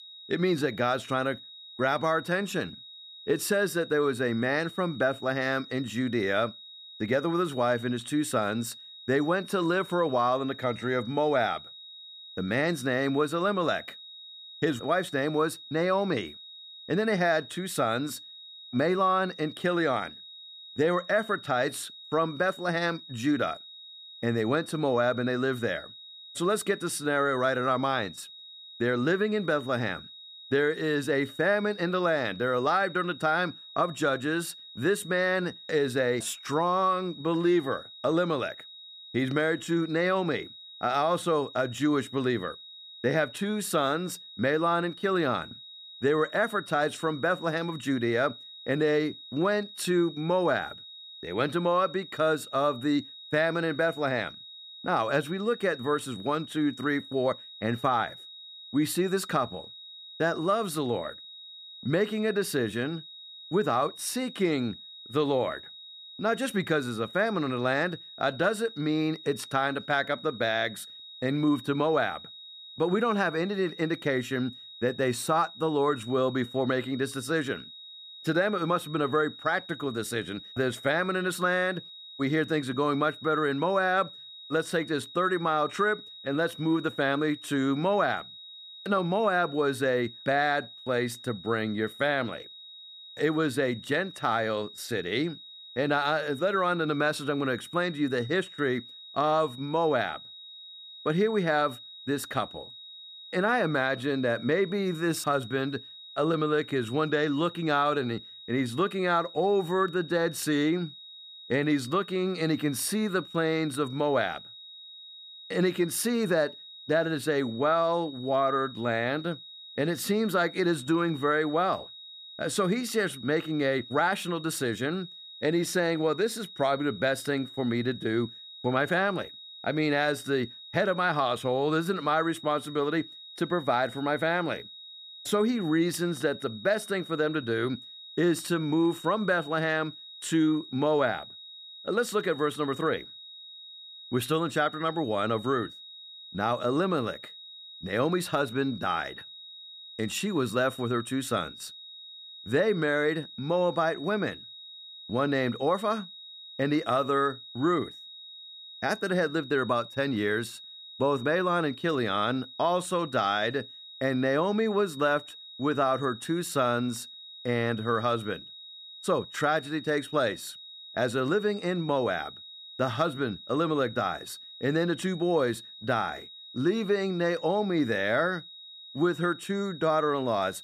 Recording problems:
high-pitched whine; noticeable; throughout; 4 kHz, 15 dB below the speech

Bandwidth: 14.5 kHz